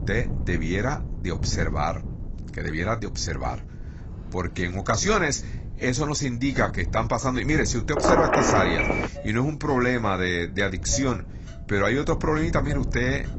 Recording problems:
garbled, watery; badly; nothing above 8 kHz
wind noise on the microphone; occasional gusts; 20 dB below the speech
traffic noise; faint; from 4 s on; 20 dB below the speech
phone ringing; loud; from 8 to 9 s; peak 4 dB above the speech

